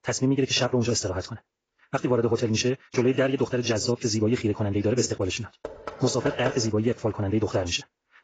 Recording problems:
garbled, watery; badly; nothing above 7.5 kHz
wrong speed, natural pitch; too fast; 1.8 times normal speed
door banging; noticeable; from 5.5 to 6.5 s; peak 8 dB below the speech

